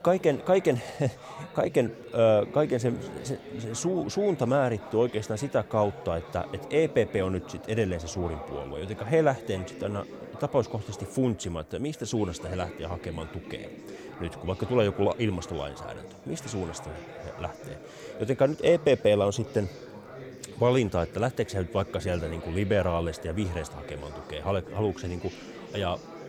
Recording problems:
chatter from many people; noticeable; throughout; 15 dB below the speech

